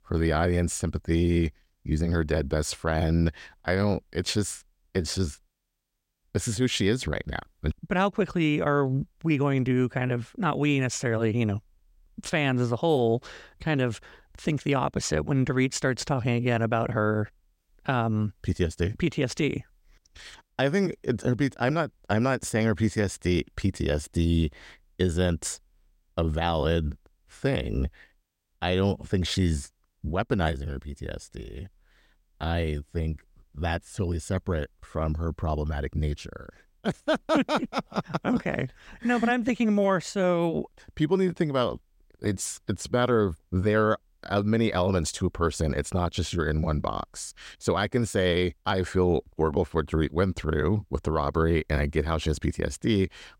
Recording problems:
none

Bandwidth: 16 kHz